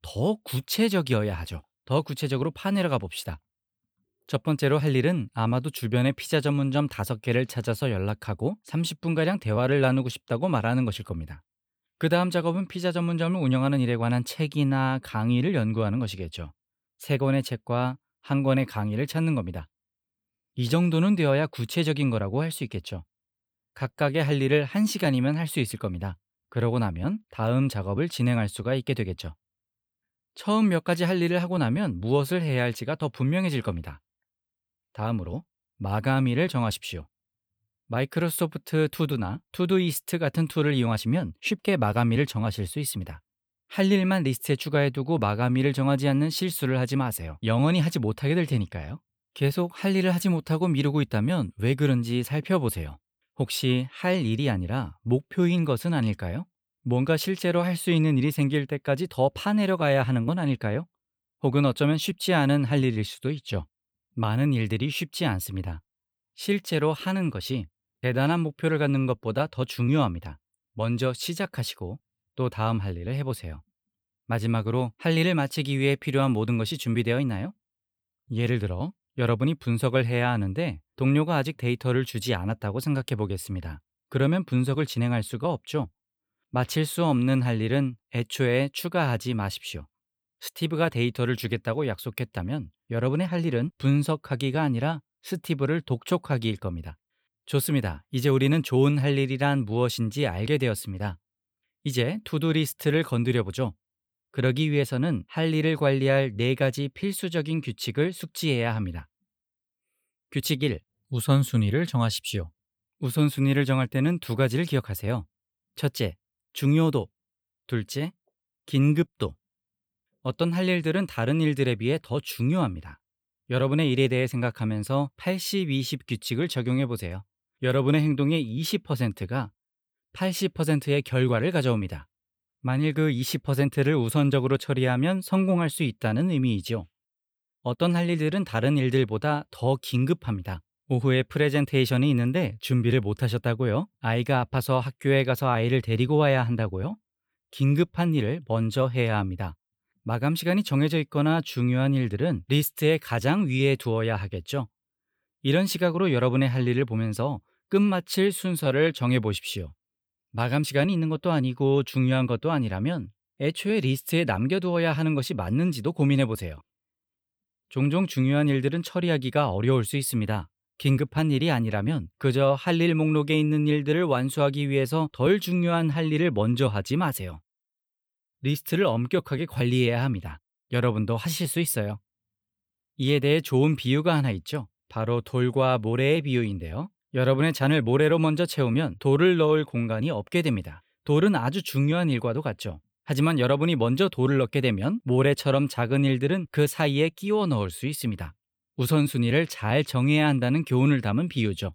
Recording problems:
none

